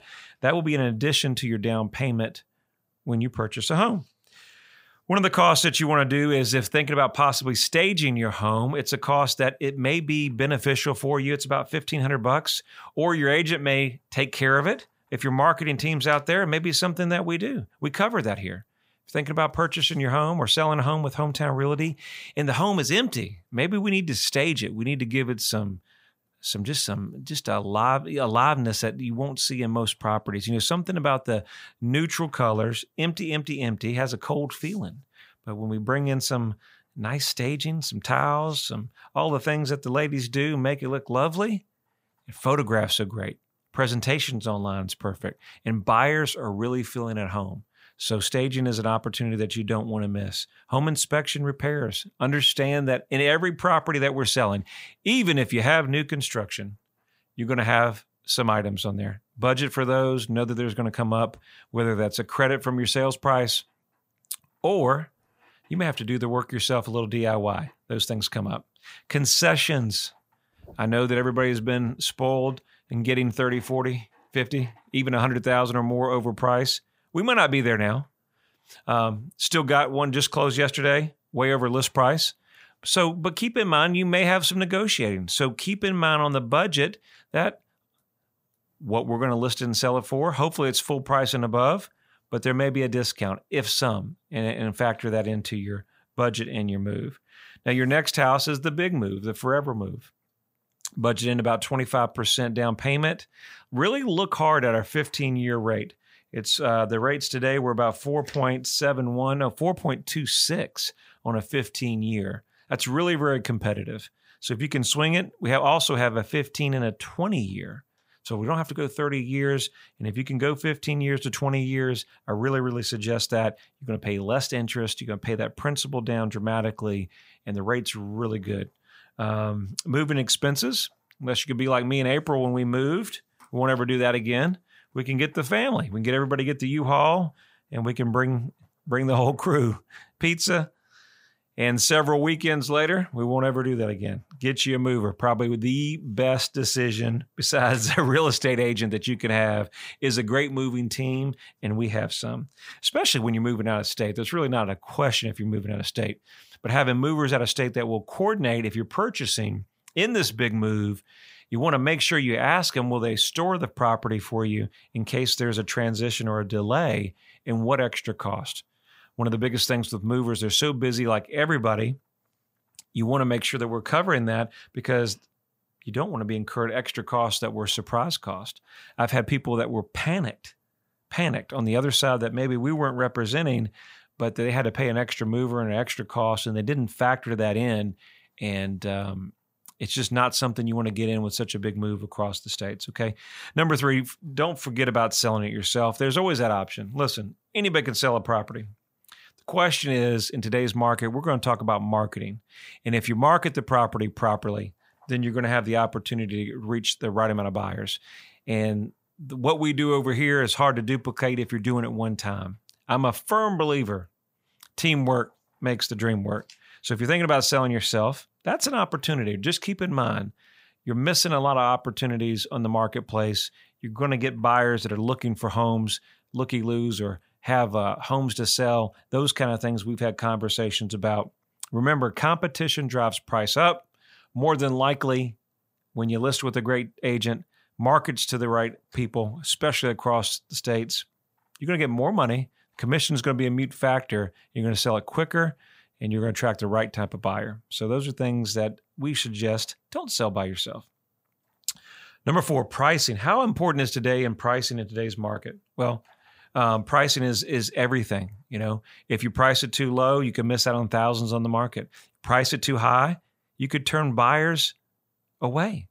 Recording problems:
none

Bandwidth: 15.5 kHz